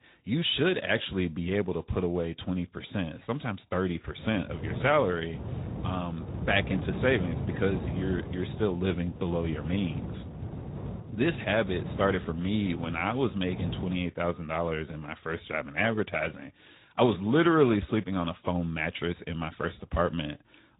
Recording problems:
high frequencies cut off; severe; nothing above 3.5 kHz
garbled, watery; slightly
wind noise on the microphone; occasional gusts; from 4 to 14 s; 15 dB below the speech

